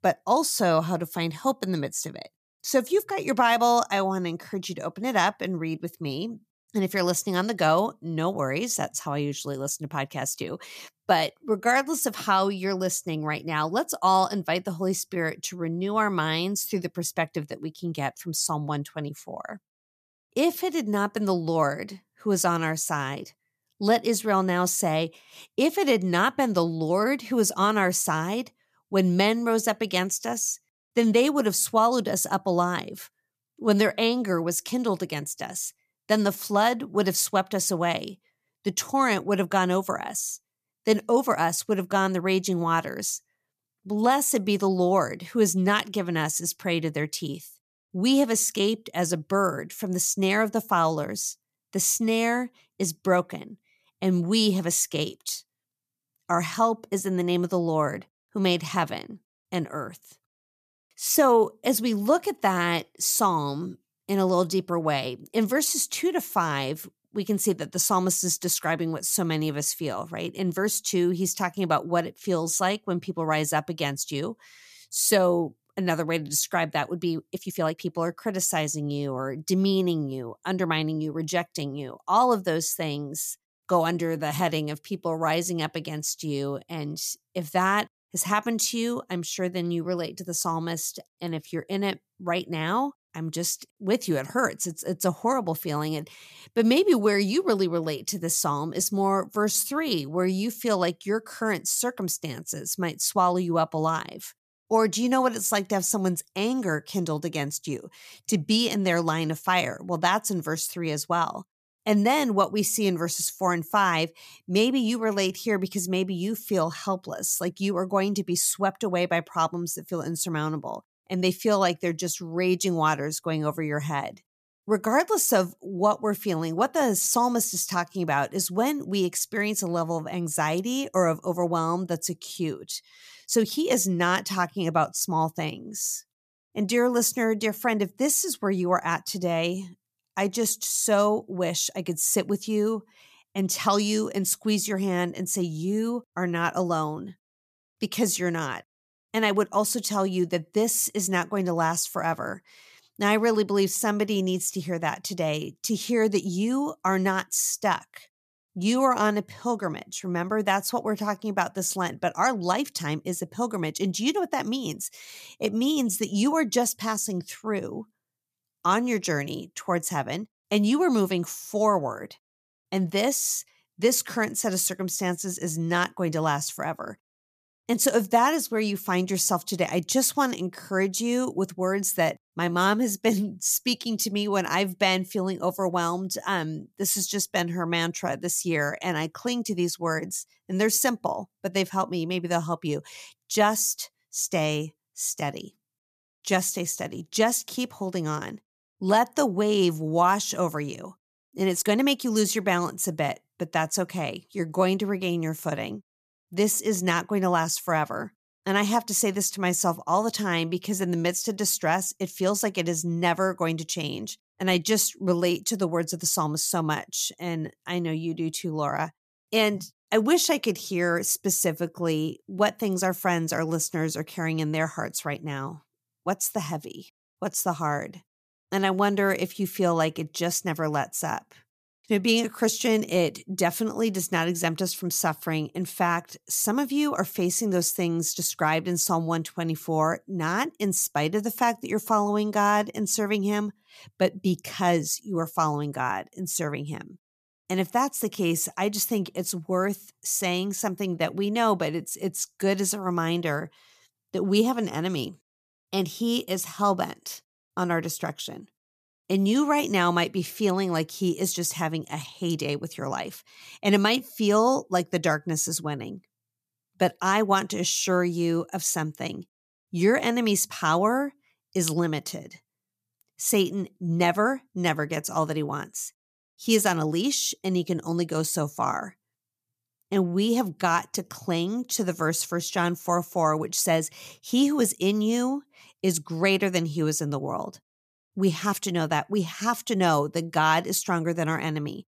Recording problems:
uneven, jittery; strongly; from 11 s to 4:50

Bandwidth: 14.5 kHz